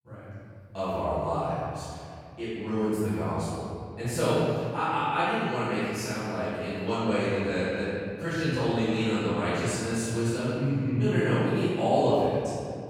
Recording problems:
room echo; strong; dies away in 2.2 s
off-mic speech; far

